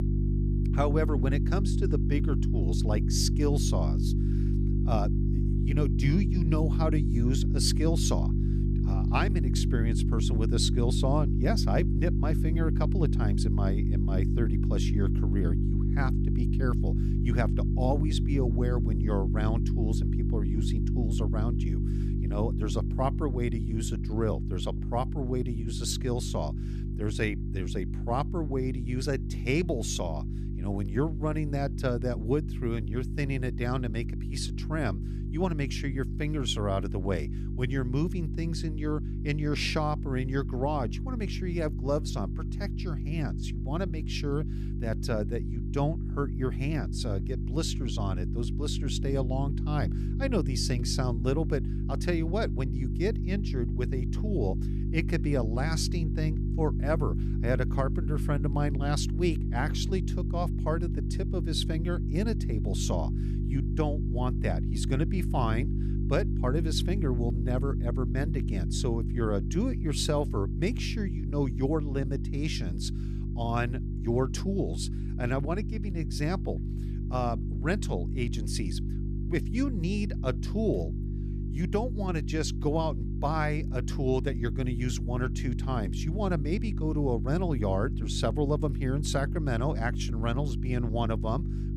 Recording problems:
electrical hum; loud; throughout; 50 Hz, 7 dB below the speech

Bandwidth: 14 kHz